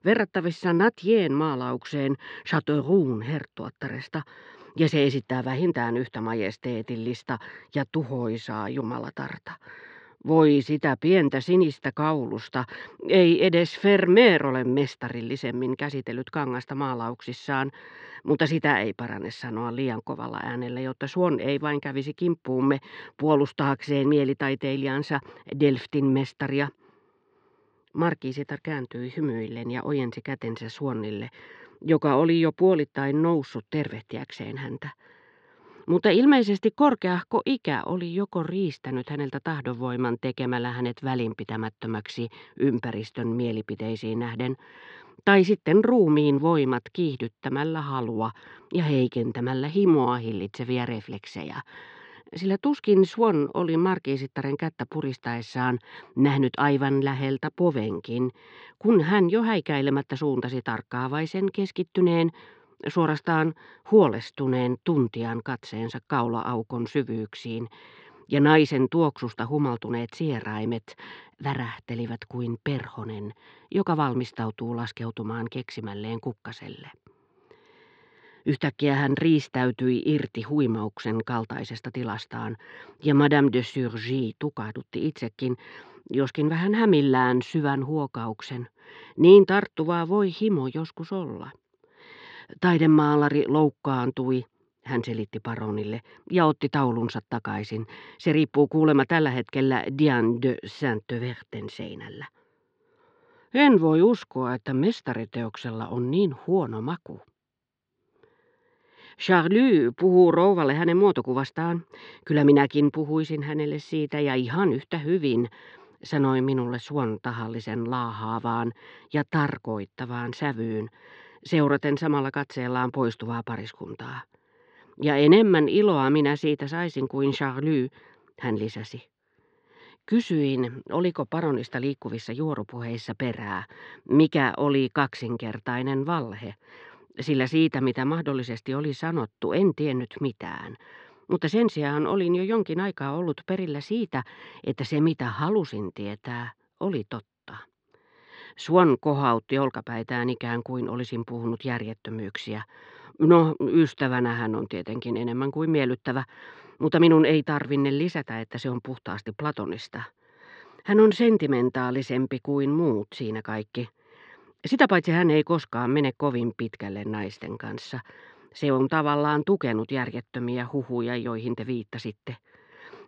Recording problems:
muffled; slightly; fading above 4 kHz

